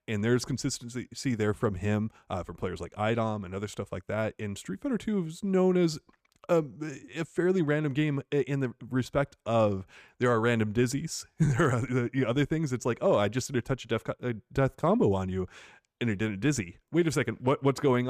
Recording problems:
abrupt cut into speech; at the end

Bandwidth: 15 kHz